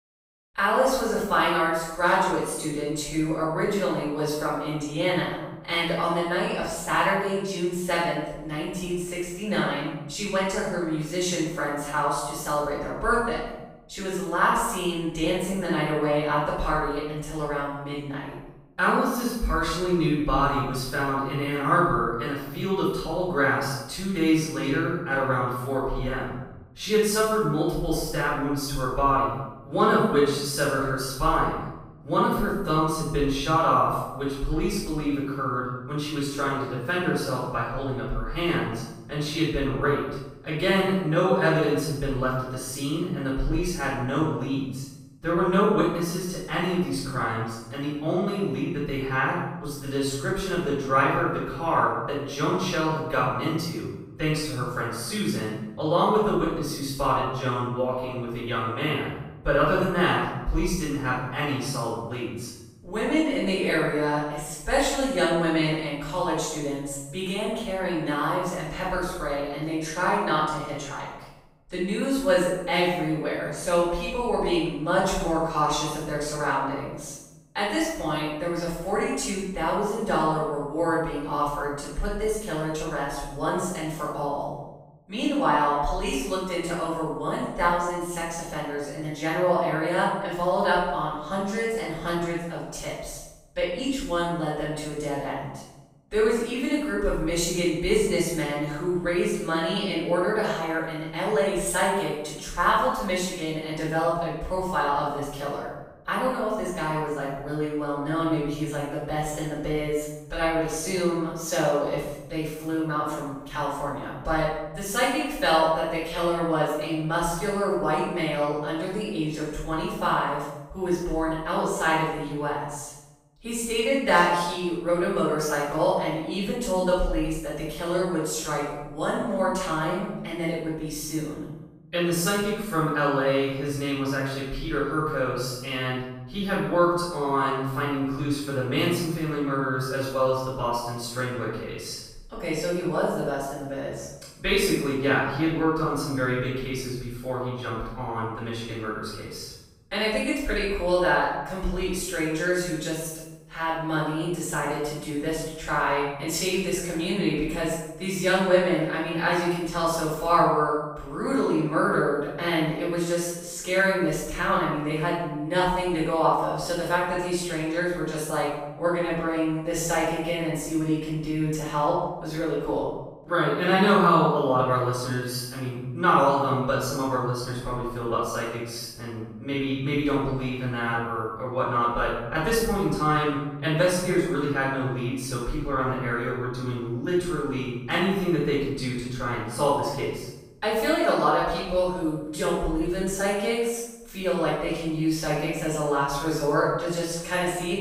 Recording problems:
room echo; strong; dies away in 0.9 s
off-mic speech; far

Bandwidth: 15.5 kHz